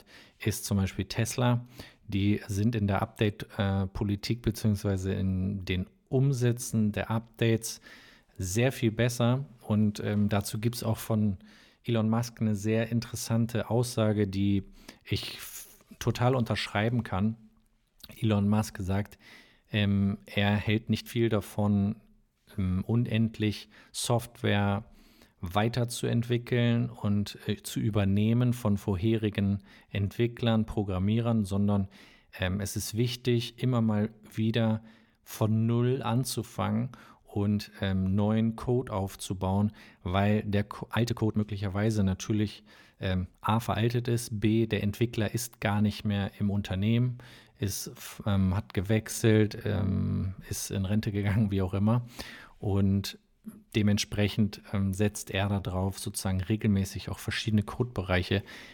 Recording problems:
uneven, jittery; strongly; from 6 to 56 s

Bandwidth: 18 kHz